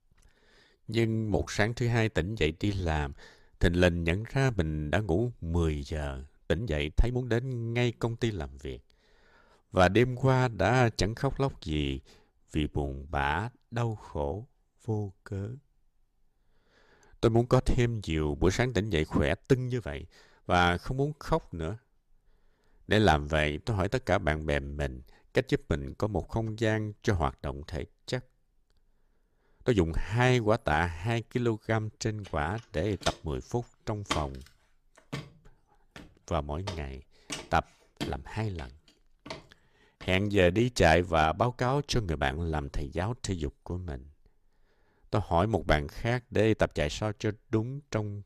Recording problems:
uneven, jittery; strongly; from 0.5 to 47 s
footsteps; noticeable; from 33 to 40 s; peak 5 dB below the speech

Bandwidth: 14.5 kHz